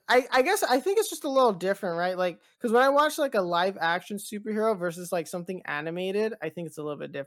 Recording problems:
none

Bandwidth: 17 kHz